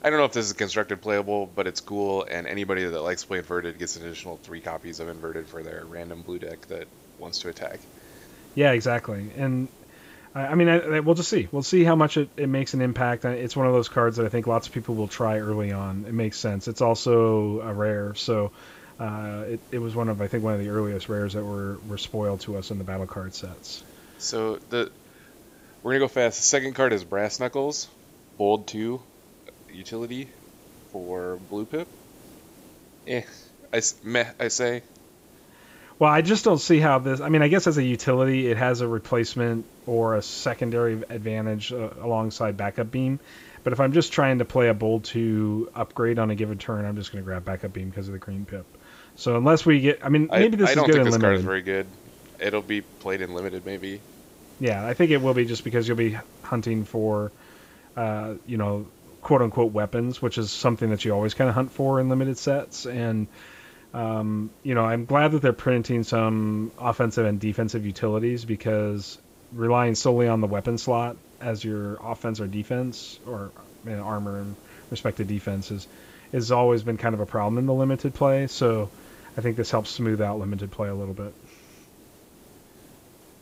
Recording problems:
high frequencies cut off; noticeable; nothing above 8 kHz
hiss; faint; throughout; 25 dB below the speech

